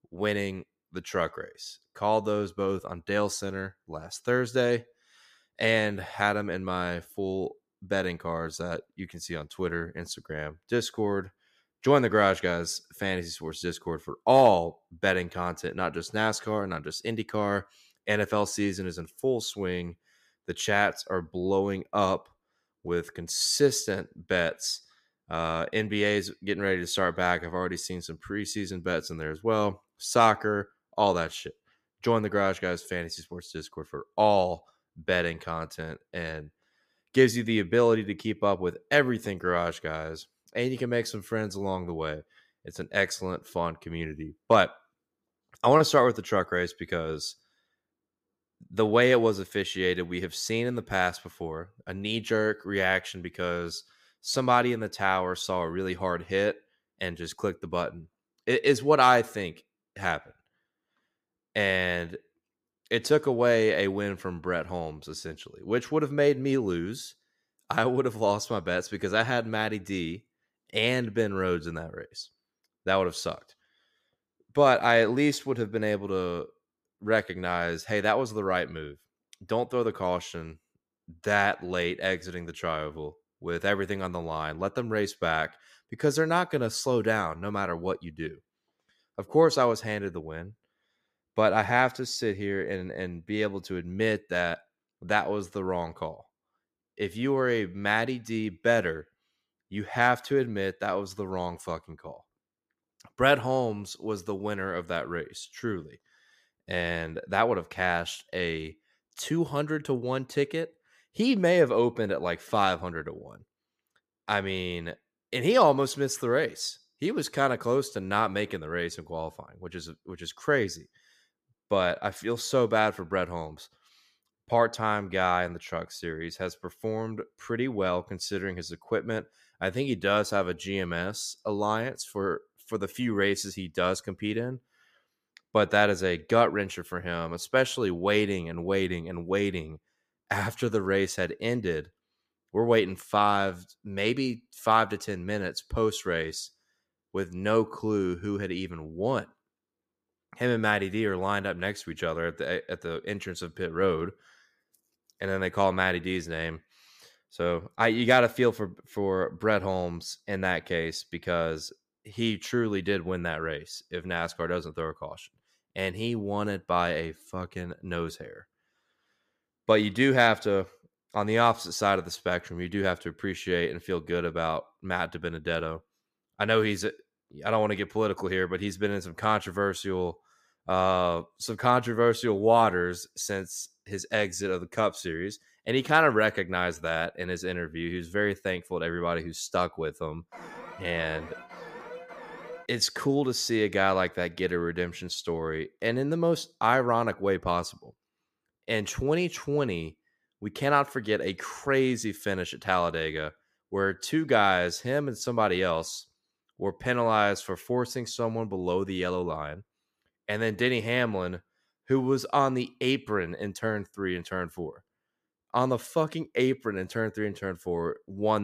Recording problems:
alarm; faint; from 3:10 to 3:13; peak 15 dB below the speech
abrupt cut into speech; at the end

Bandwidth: 15 kHz